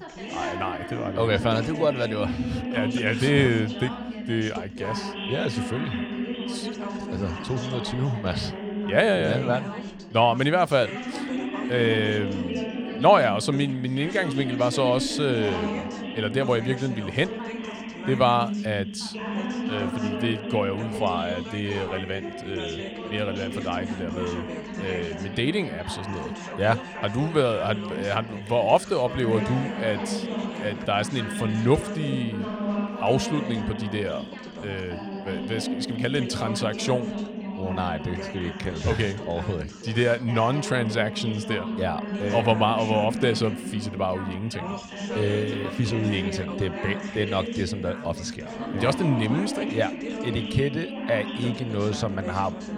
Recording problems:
background chatter; loud; throughout; 3 voices, 6 dB below the speech

